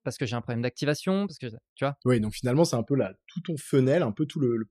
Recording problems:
none

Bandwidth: 14.5 kHz